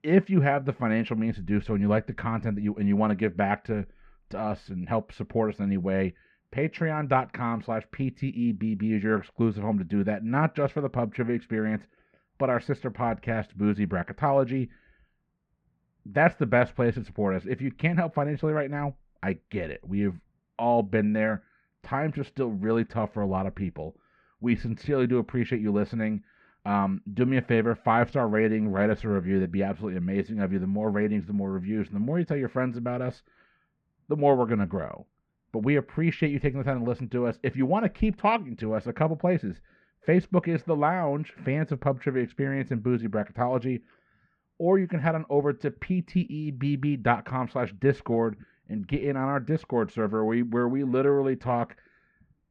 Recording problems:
muffled; very; fading above 2 kHz

